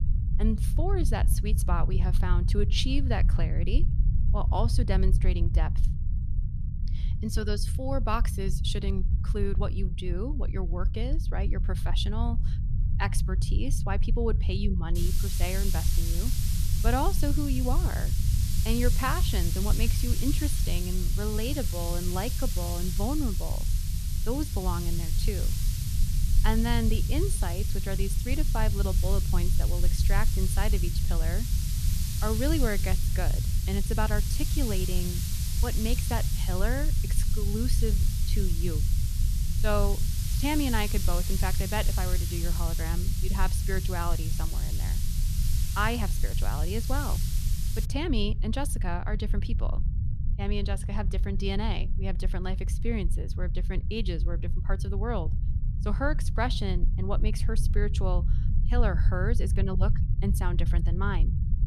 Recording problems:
hiss; loud; from 15 to 48 s; 4 dB below the speech
low rumble; noticeable; throughout; 10 dB below the speech

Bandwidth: 14 kHz